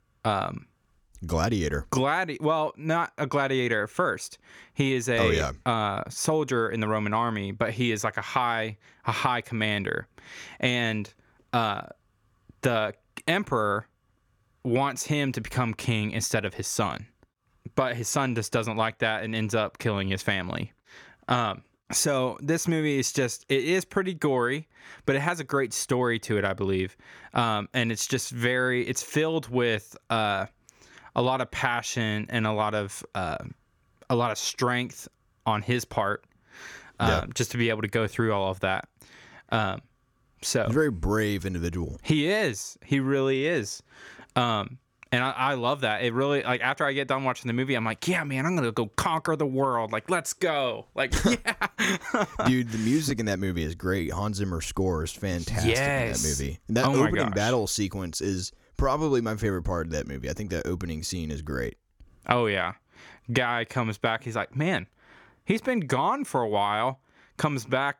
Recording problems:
none

